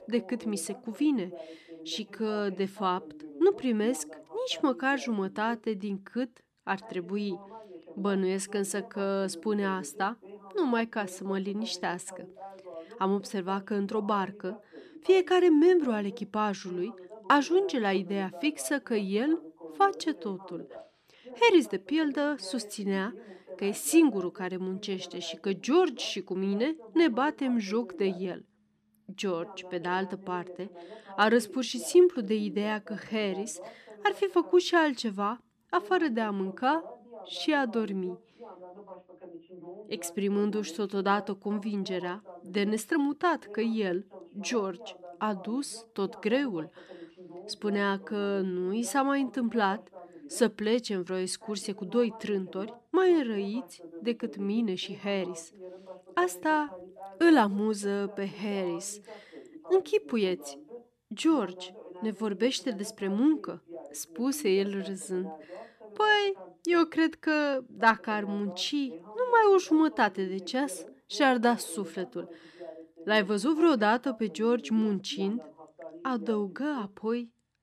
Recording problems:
voice in the background; noticeable; throughout; 20 dB below the speech

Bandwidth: 14 kHz